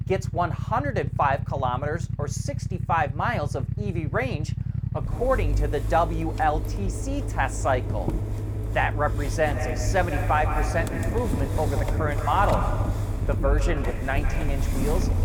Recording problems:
echo of what is said; strong; from 9.5 s on; 150 ms later, 8 dB below the speech
traffic noise; loud; throughout; 1 dB below the speech

